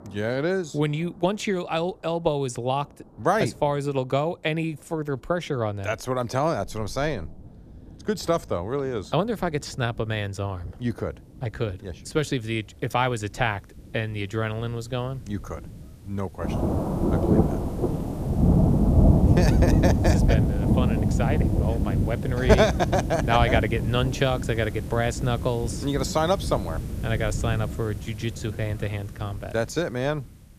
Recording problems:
rain or running water; very loud; throughout; 2 dB above the speech

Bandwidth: 14.5 kHz